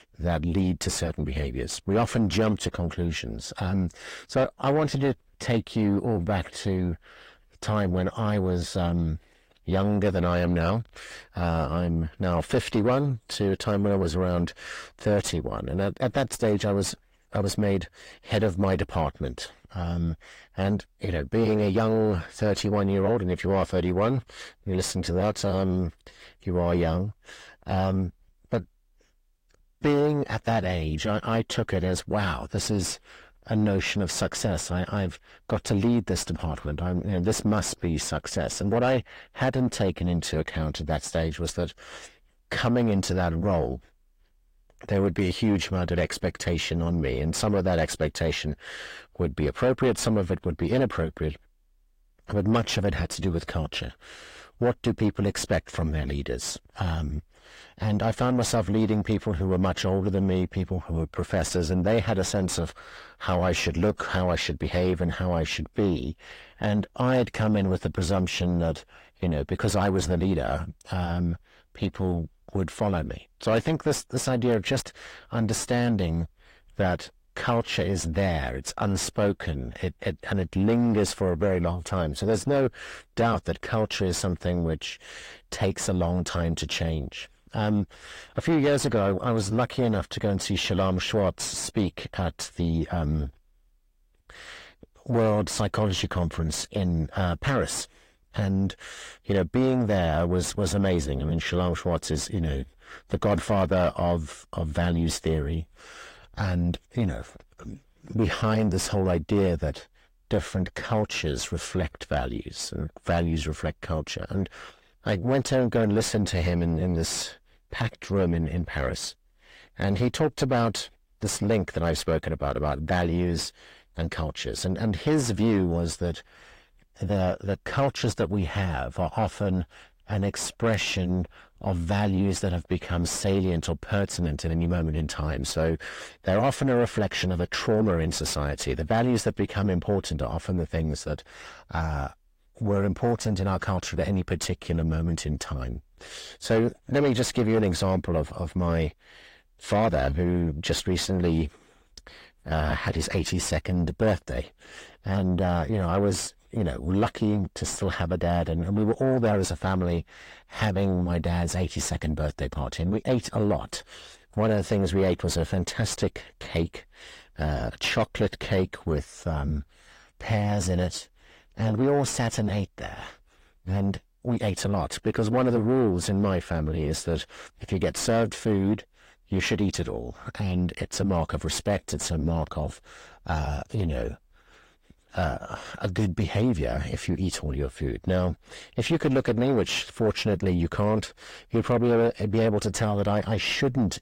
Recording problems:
distortion; slight; 10 dB below the speech
garbled, watery; slightly; nothing above 16 kHz

